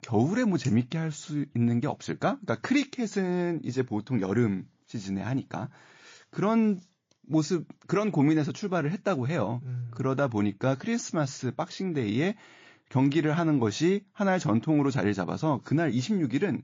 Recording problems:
garbled, watery; slightly; nothing above 17.5 kHz

